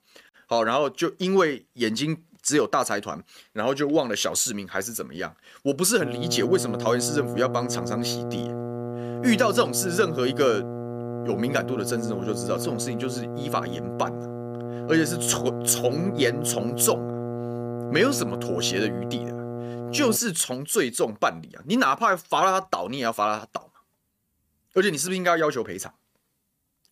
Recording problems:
electrical hum; loud; from 6 to 20 s; 60 Hz, 10 dB below the speech

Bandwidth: 15 kHz